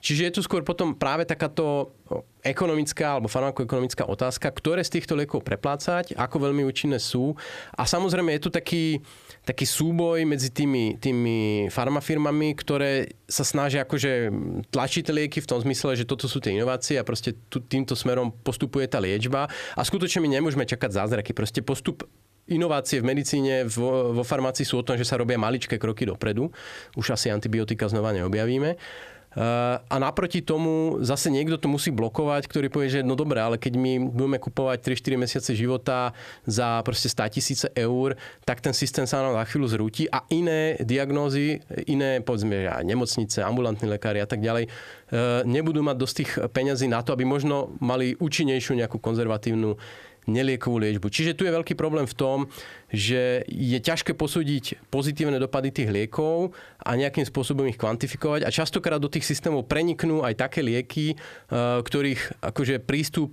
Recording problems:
squashed, flat; heavily

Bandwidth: 14.5 kHz